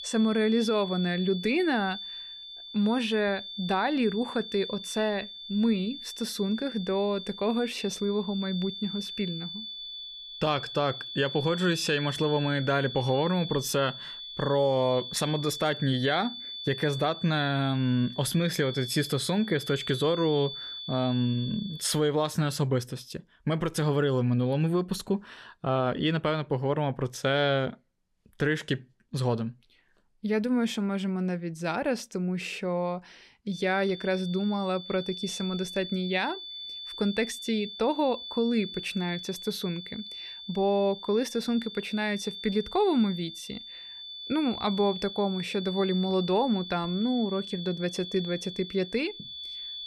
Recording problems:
high-pitched whine; loud; until 22 s and from 34 s on; 3.5 kHz, 9 dB below the speech

